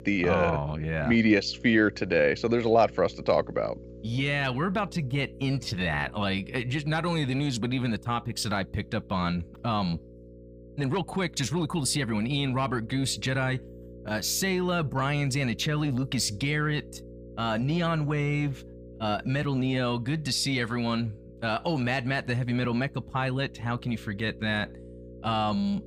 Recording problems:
electrical hum; faint; throughout; 60 Hz, 20 dB below the speech

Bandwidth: 15 kHz